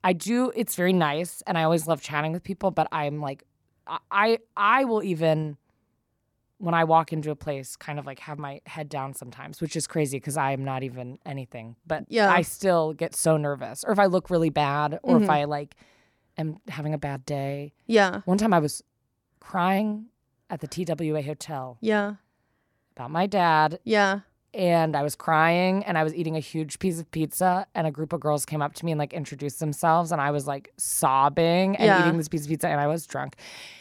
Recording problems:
none

